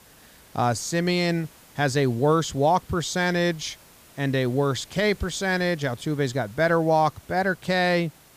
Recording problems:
hiss; faint; throughout; 25 dB below the speech

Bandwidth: 15 kHz